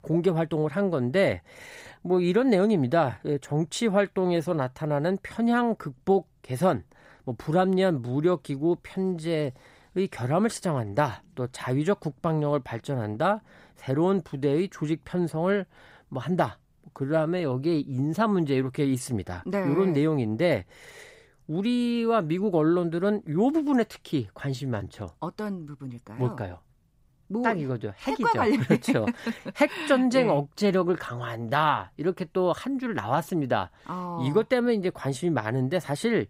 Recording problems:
none

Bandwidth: 15.5 kHz